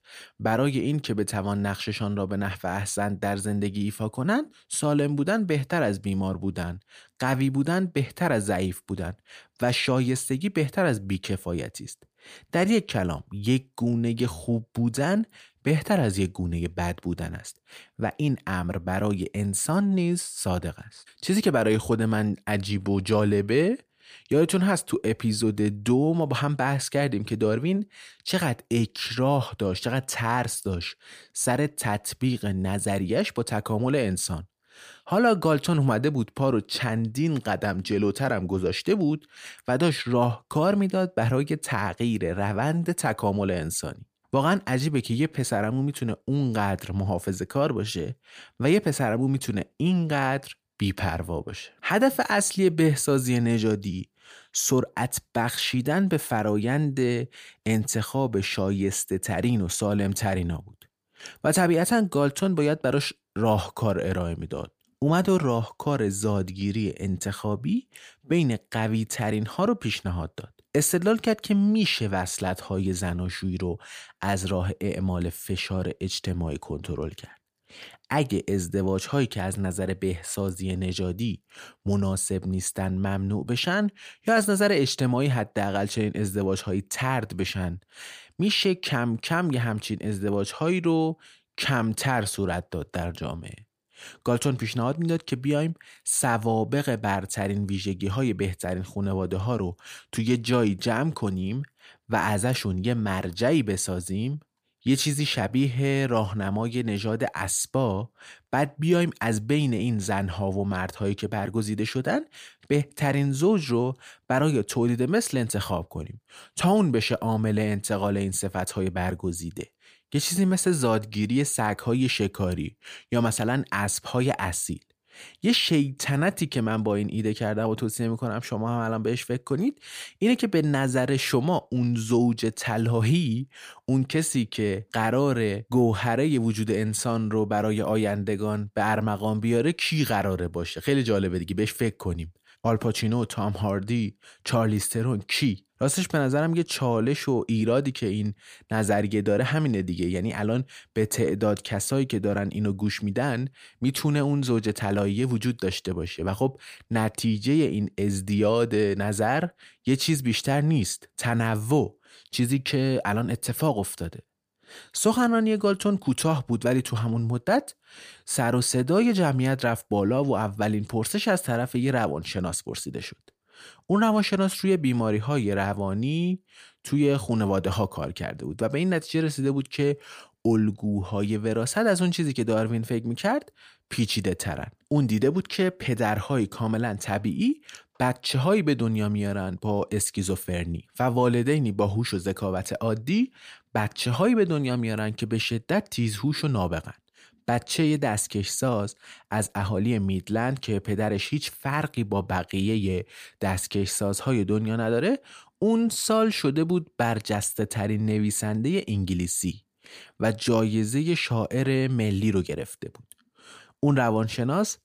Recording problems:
none

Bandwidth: 15 kHz